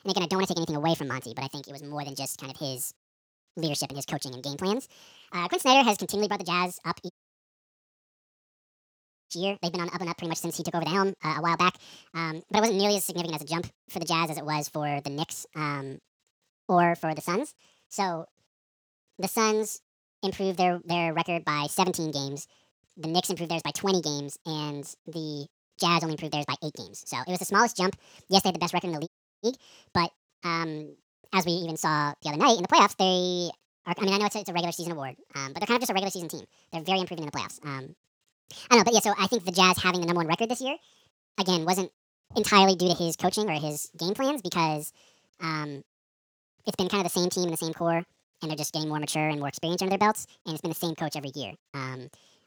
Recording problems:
wrong speed and pitch; too fast and too high; 1.7 times normal speed
audio cutting out; at 7 s for 2 s and at 29 s

